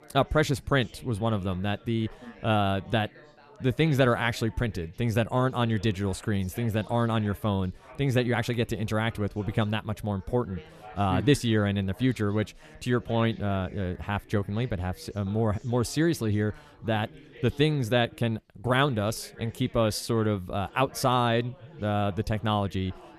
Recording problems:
chatter from many people; faint; throughout; 25 dB below the speech

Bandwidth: 14 kHz